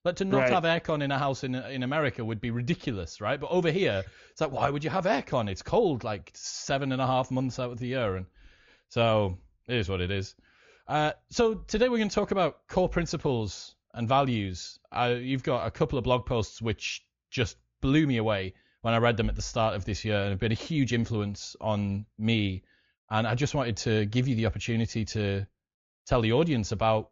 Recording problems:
high frequencies cut off; noticeable; nothing above 7 kHz

